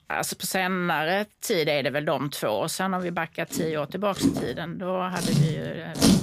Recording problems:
household noises; very loud; throughout; as loud as the speech

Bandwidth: 15 kHz